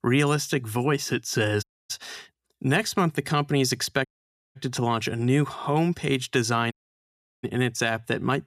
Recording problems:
audio cutting out; at 1.5 s, at 4 s for 0.5 s and at 6.5 s for 0.5 s

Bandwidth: 14.5 kHz